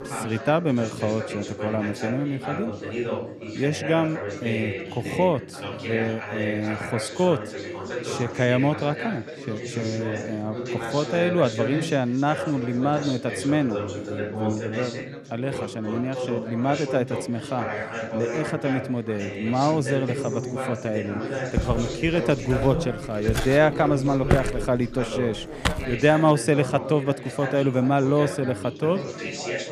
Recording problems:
background chatter; loud; throughout; 4 voices, 6 dB below the speech
footsteps; loud; from 22 to 26 s; peak 1 dB above the speech

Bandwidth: 14.5 kHz